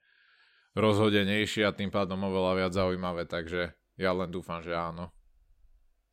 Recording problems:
none

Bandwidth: 16 kHz